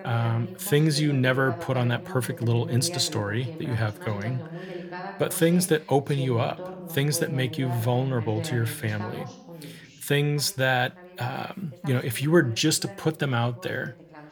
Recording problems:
voice in the background; noticeable; throughout; 15 dB below the speech

